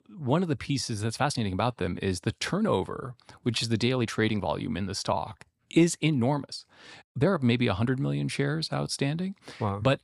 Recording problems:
uneven, jittery; strongly; from 0.5 to 9 s

